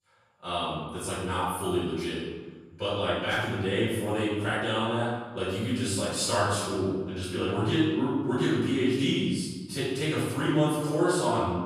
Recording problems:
room echo; strong; dies away in 1.2 s
off-mic speech; far

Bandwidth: 14.5 kHz